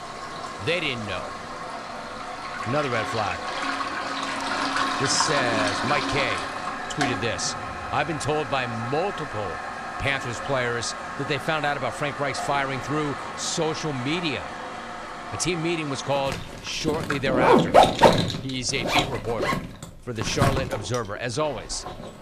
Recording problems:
household noises; very loud; throughout; as loud as the speech

